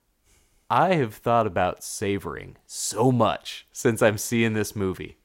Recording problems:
none

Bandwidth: 16 kHz